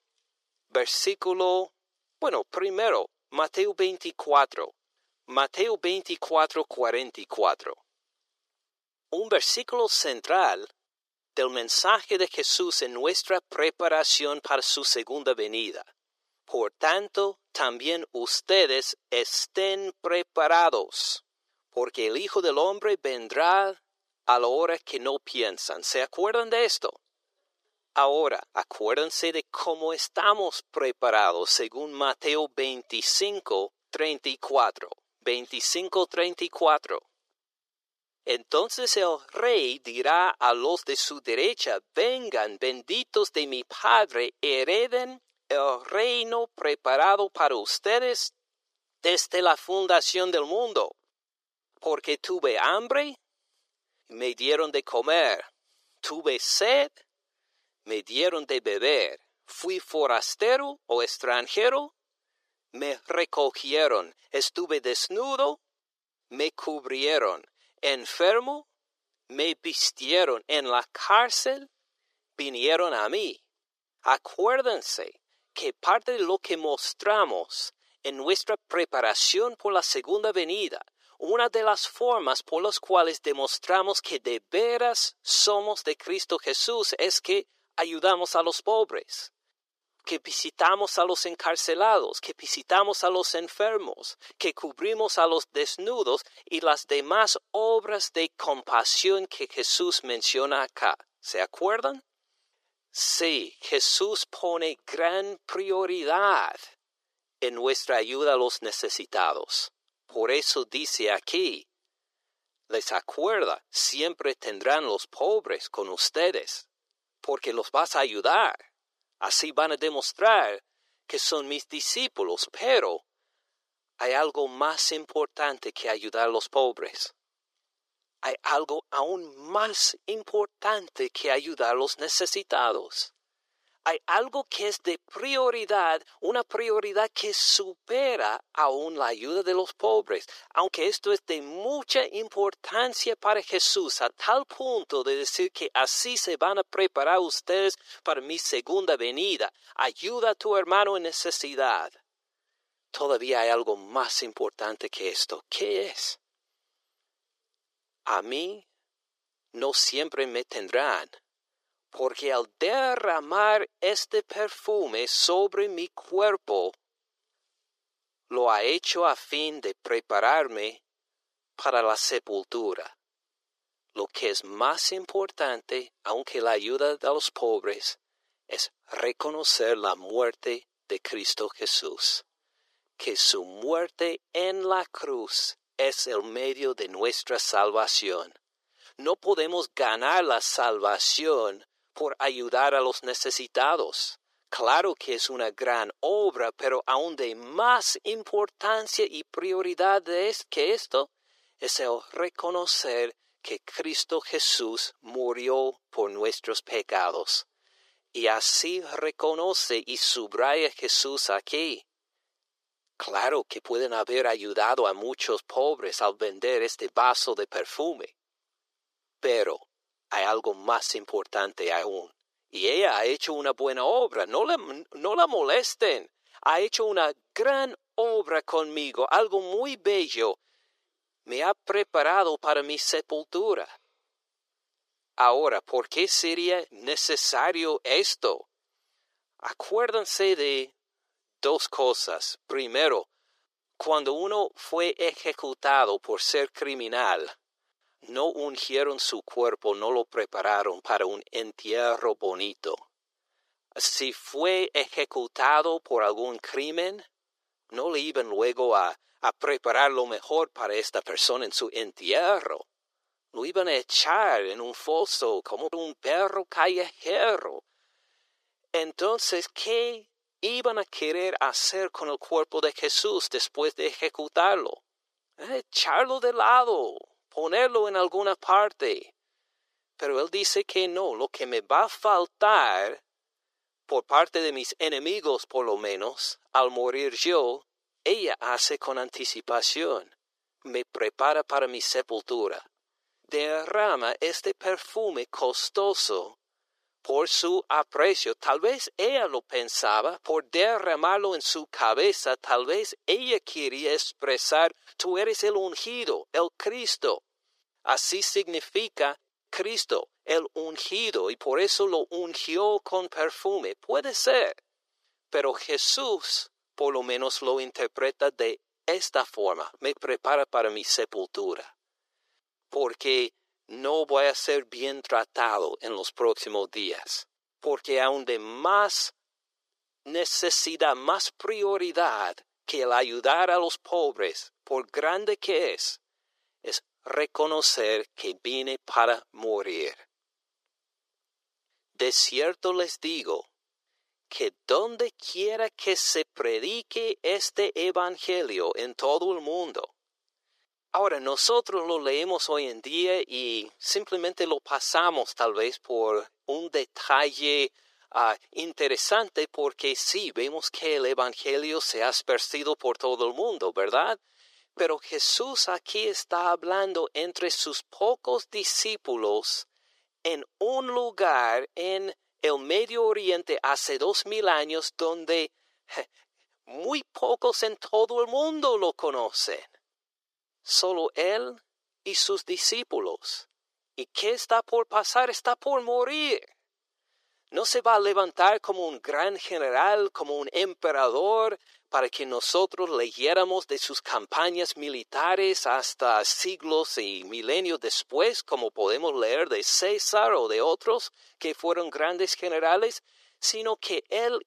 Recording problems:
thin; very; fading below 400 Hz

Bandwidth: 14.5 kHz